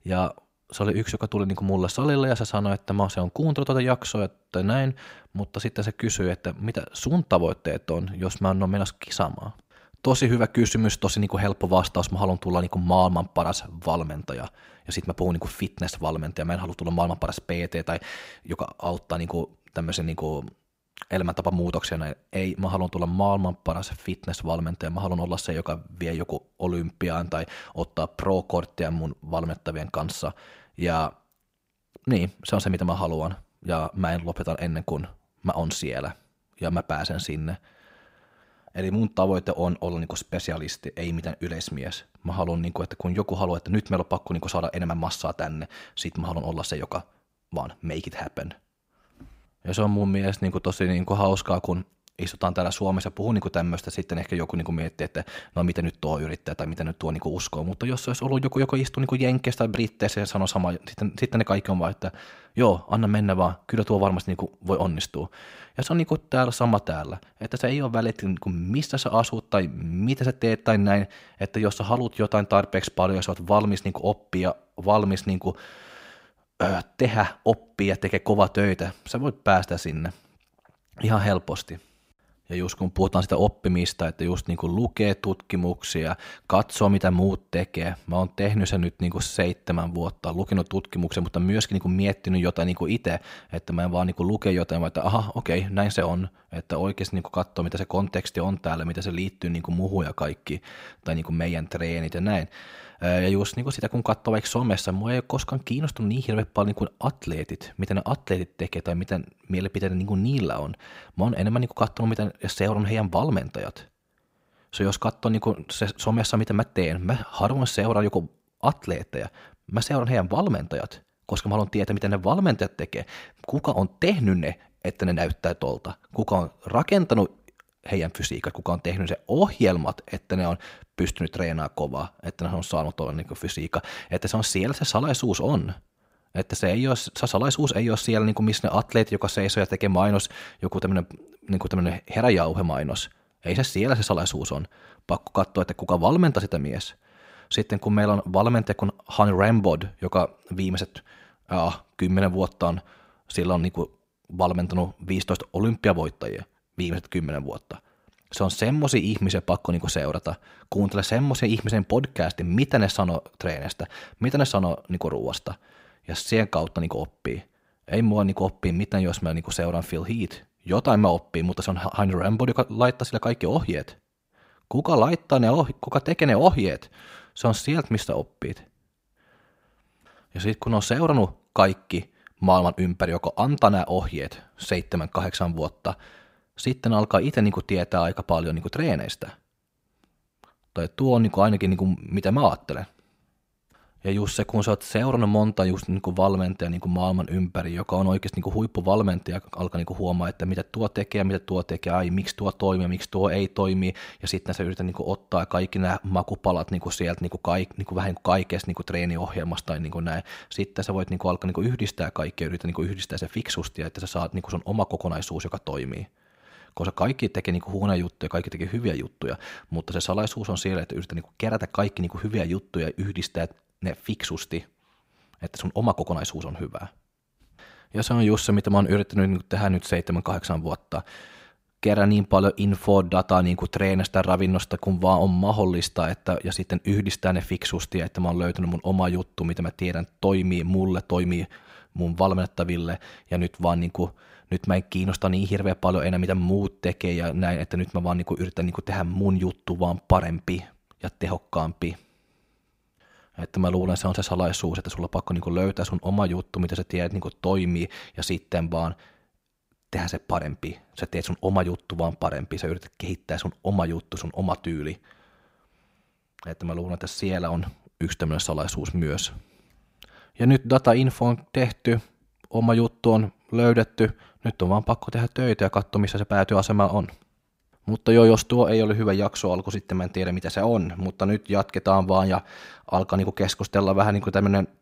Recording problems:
none

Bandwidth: 15.5 kHz